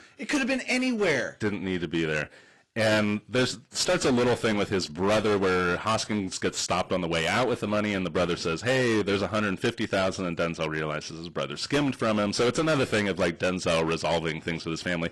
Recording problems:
distortion; heavy; 13% of the sound clipped
garbled, watery; slightly; nothing above 11.5 kHz

